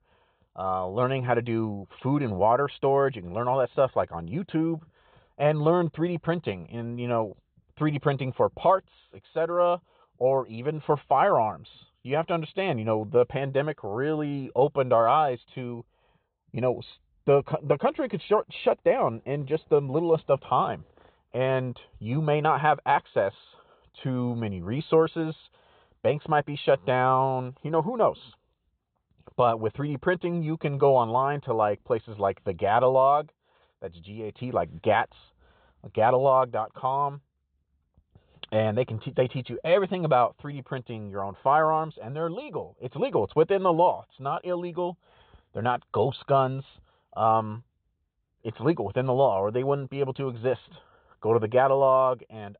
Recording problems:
high frequencies cut off; severe; nothing above 4 kHz

